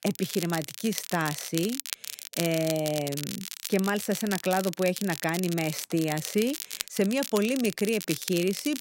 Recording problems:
crackle, like an old record; loud; 7 dB below the speech

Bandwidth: 16 kHz